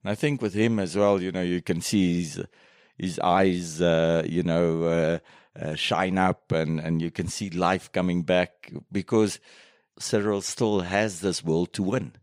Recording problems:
none

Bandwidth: 15.5 kHz